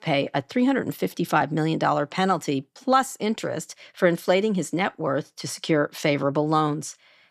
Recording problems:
none

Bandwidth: 14.5 kHz